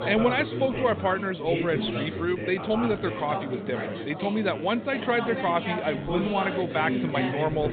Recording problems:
high frequencies cut off; severe; nothing above 4 kHz
chatter from many people; loud; throughout; 4 dB below the speech

